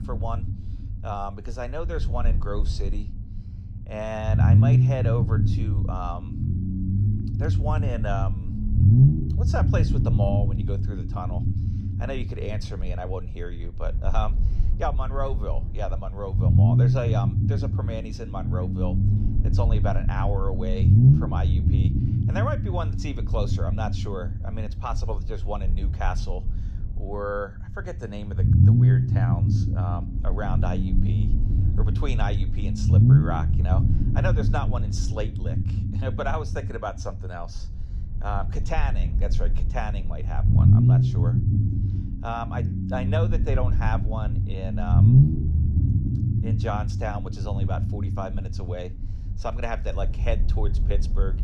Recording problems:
low rumble; loud; throughout; 2 dB below the speech

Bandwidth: 15 kHz